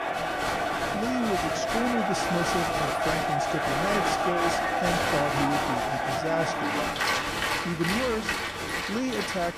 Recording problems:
crowd noise; very loud; throughout; 4 dB above the speech

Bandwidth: 14.5 kHz